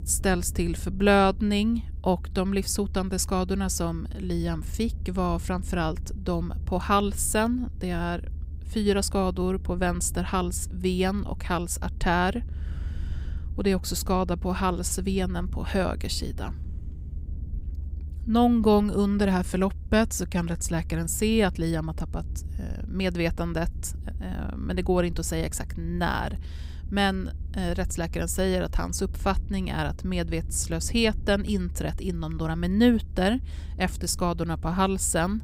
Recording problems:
low rumble; faint; throughout; 25 dB below the speech

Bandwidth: 15.5 kHz